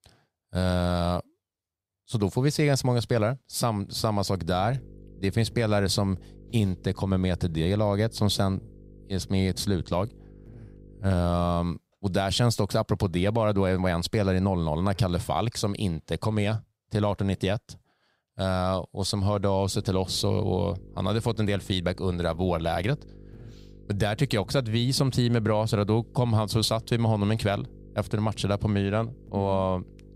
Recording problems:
electrical hum; faint; from 4.5 to 12 s and from 20 s on; 50 Hz, 25 dB below the speech

